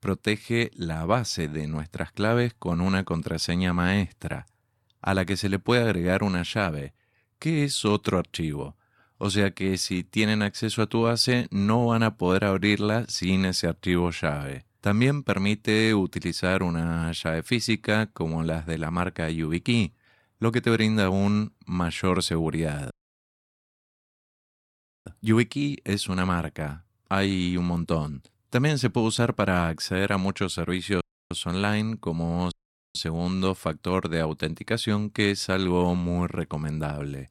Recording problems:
audio cutting out; at 23 s for 2 s, at 31 s and at 33 s

